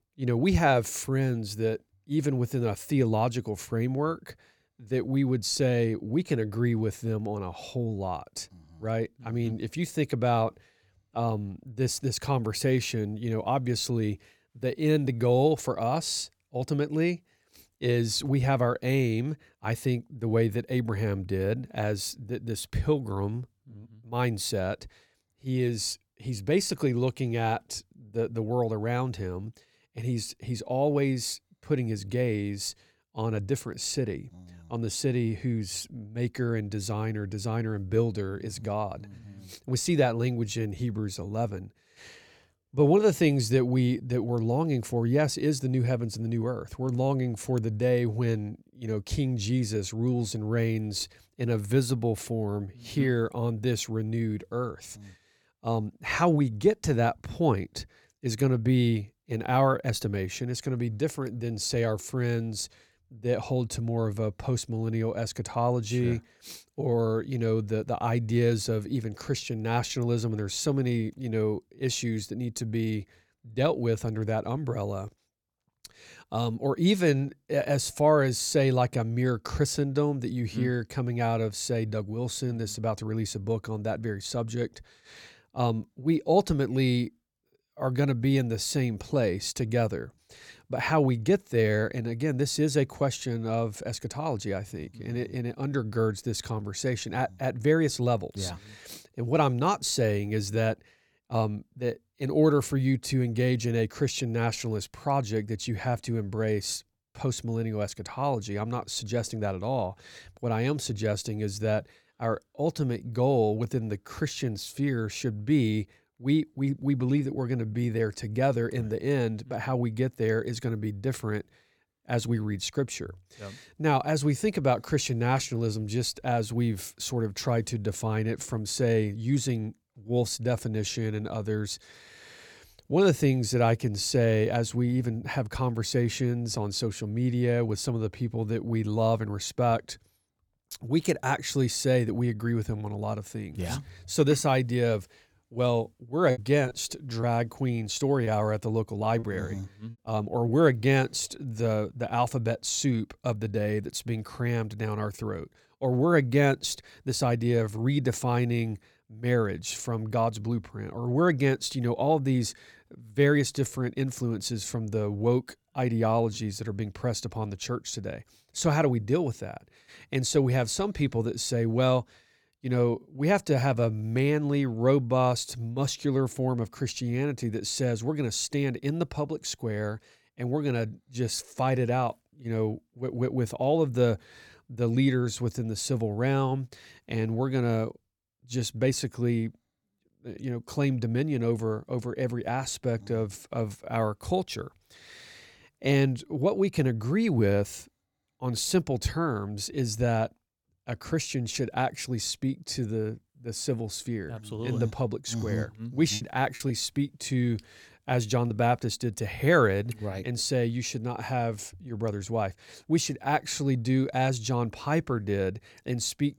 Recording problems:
choppy; very; from 2:26 to 2:30 and from 3:26 to 3:29; 6% of the speech affected

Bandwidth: 18 kHz